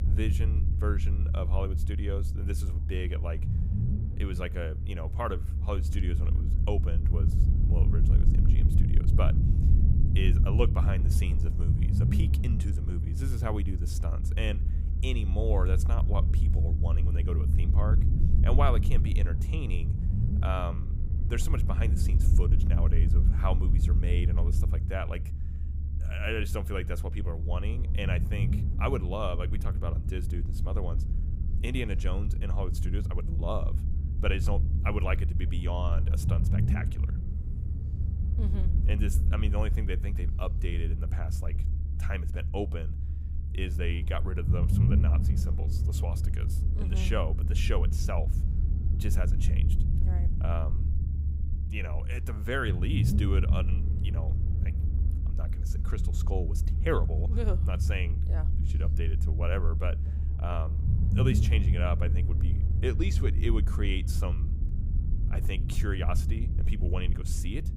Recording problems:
low rumble; loud; throughout; 6 dB below the speech

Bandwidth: 15.5 kHz